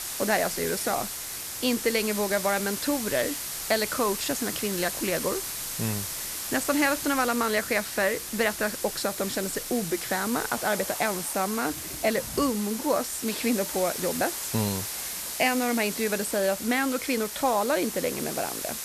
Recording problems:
hiss; loud; throughout; 4 dB below the speech
rain or running water; faint; throughout; 25 dB below the speech

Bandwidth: 14 kHz